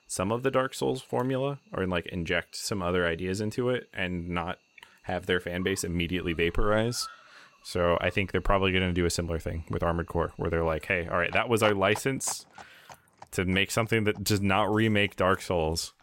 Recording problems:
animal sounds; faint; throughout; 20 dB below the speech

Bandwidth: 16 kHz